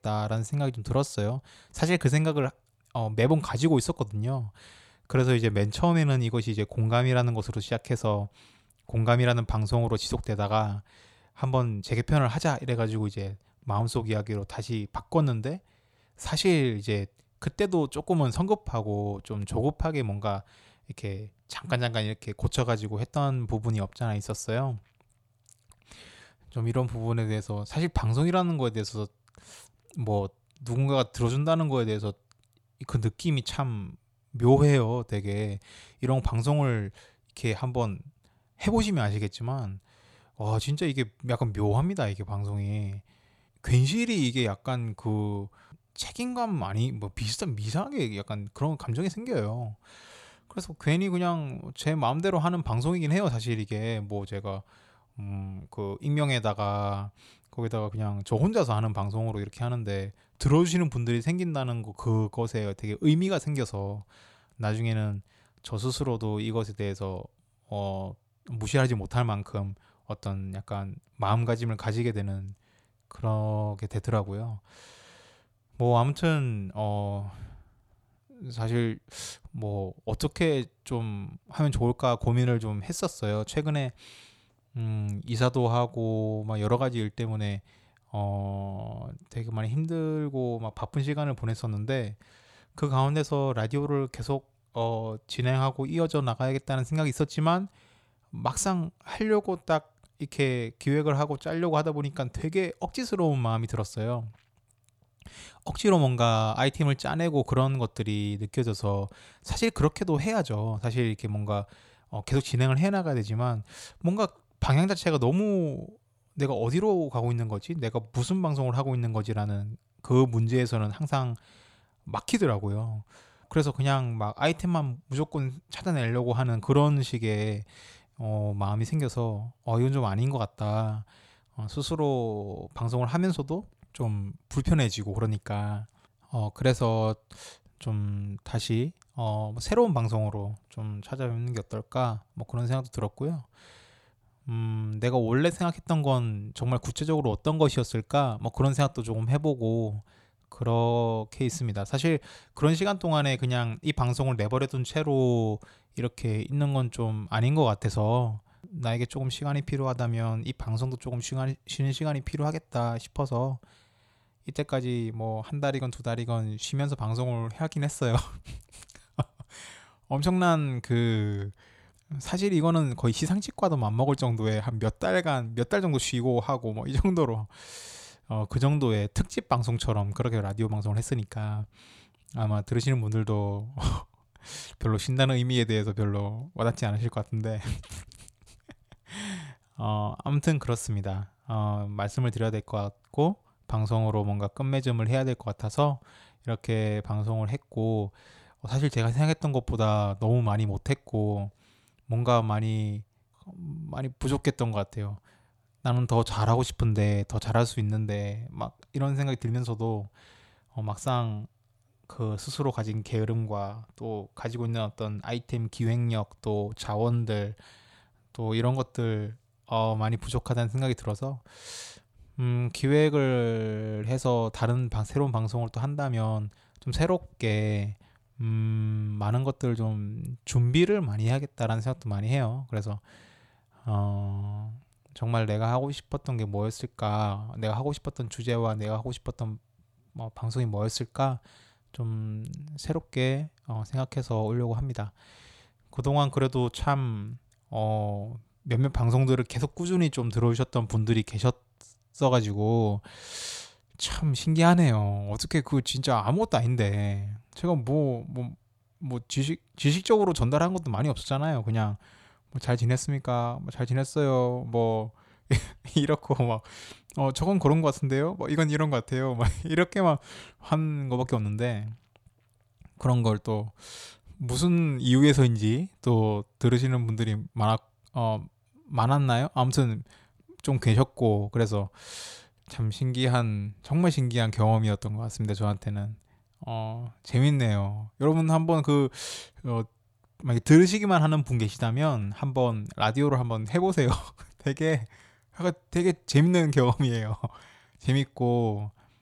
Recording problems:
none

